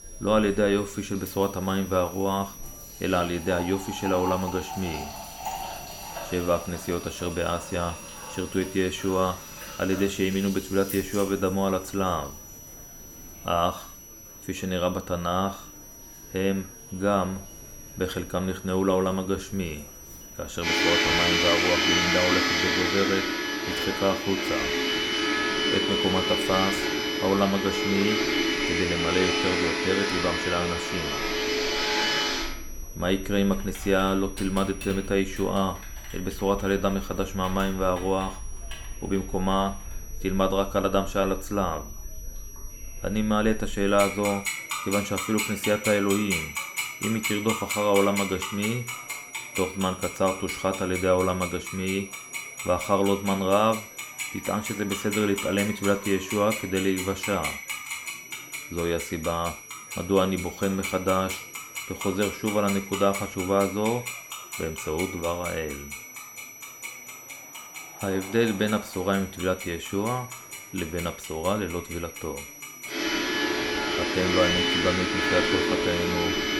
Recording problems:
household noises; loud; throughout; 1 dB below the speech
high-pitched whine; noticeable; throughout; 6 kHz, 15 dB below the speech
chatter from many people; faint; throughout; 25 dB below the speech

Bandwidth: 17 kHz